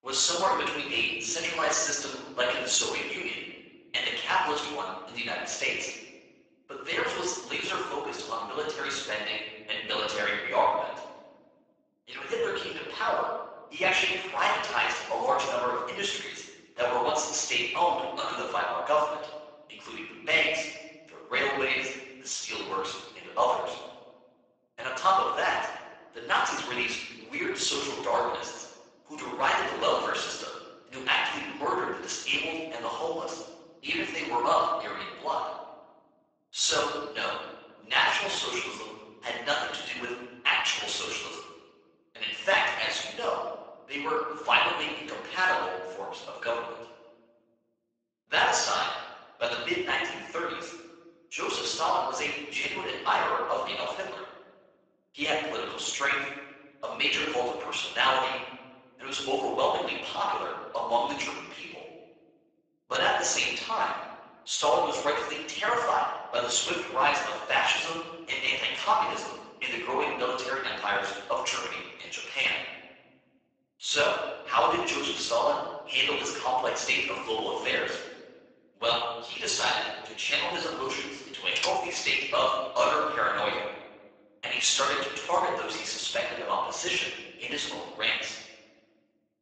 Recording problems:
off-mic speech; far
garbled, watery; badly; nothing above 7.5 kHz
thin; very; fading below 700 Hz
room echo; noticeable; dies away in 1.2 s
keyboard typing; noticeable; at 1:22; peak 3 dB below the speech

